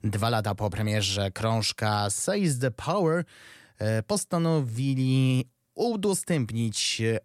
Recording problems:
none

